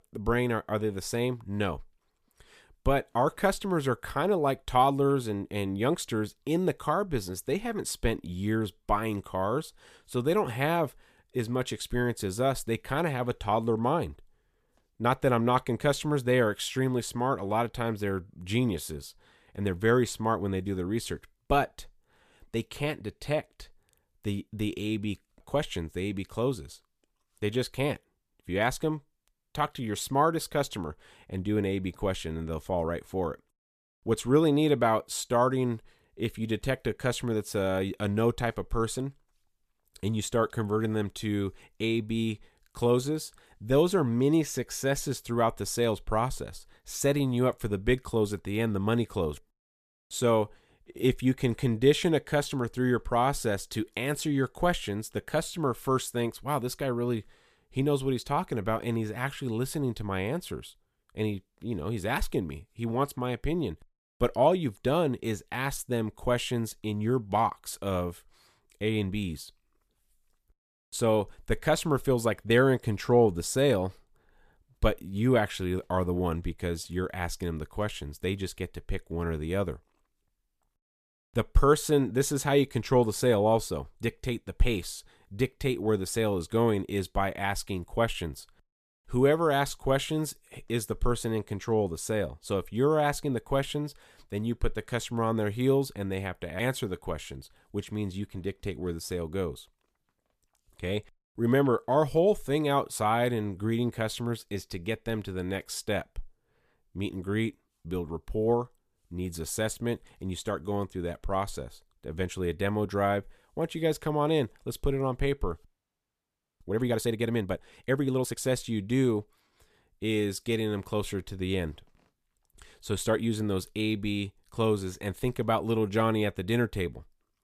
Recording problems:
audio freezing; at 1:56 for 1 s

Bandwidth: 14.5 kHz